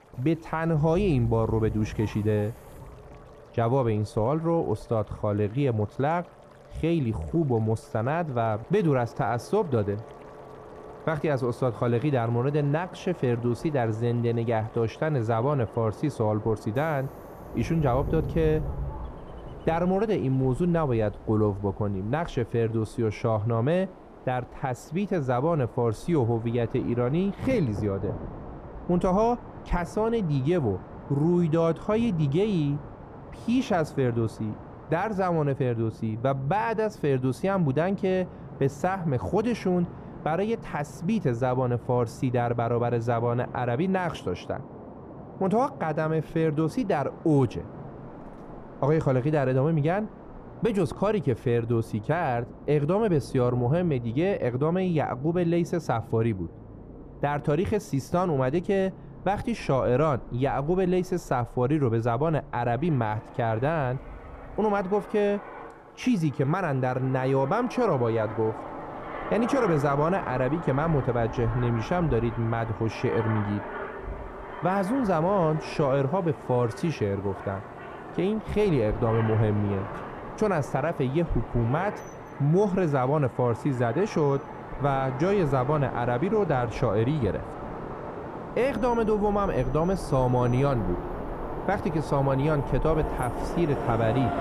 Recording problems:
muffled; slightly; fading above 1.5 kHz
train or aircraft noise; noticeable; throughout; 15 dB below the speech
rain or running water; faint; throughout; 25 dB below the speech

